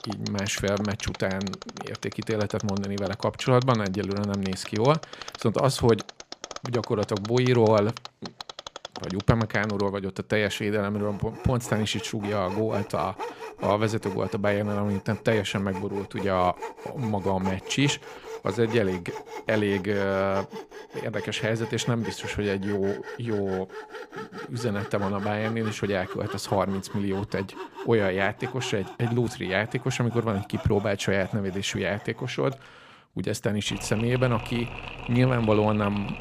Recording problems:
machinery noise; noticeable; throughout; 15 dB below the speech

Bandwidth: 15 kHz